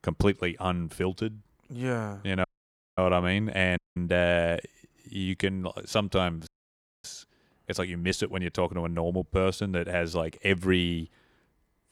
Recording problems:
audio cutting out; at 2.5 s for 0.5 s, at 4 s and at 6.5 s for 0.5 s

